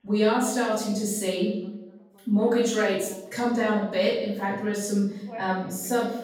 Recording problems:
off-mic speech; far
room echo; noticeable; dies away in 0.7 s
echo of what is said; faint; from 3.5 s on; 90 ms later, 20 dB below the speech
voice in the background; faint; throughout; 25 dB below the speech

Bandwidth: 17 kHz